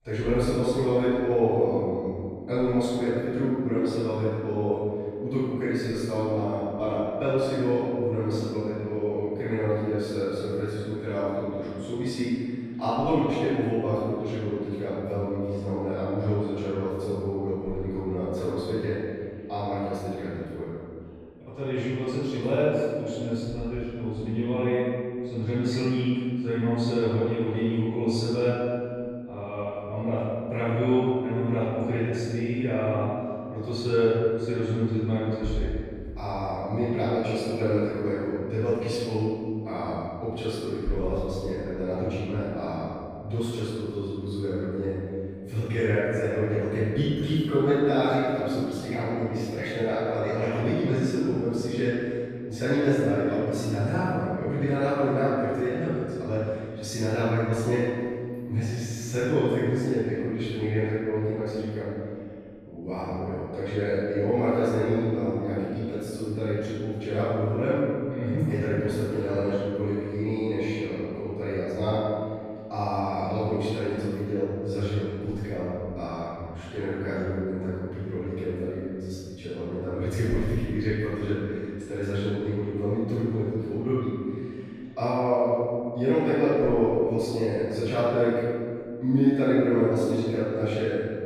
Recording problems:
room echo; strong; dies away in 2.1 s
off-mic speech; far

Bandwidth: 15 kHz